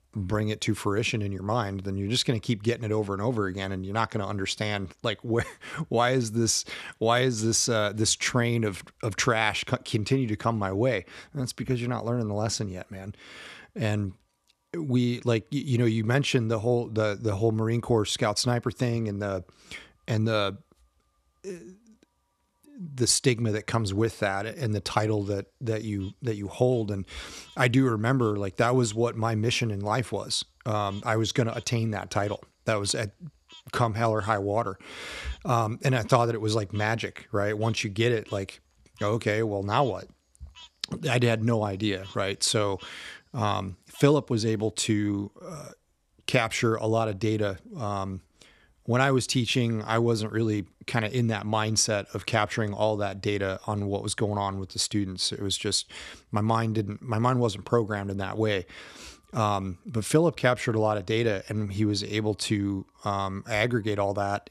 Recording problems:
animal sounds; faint; throughout; 25 dB below the speech

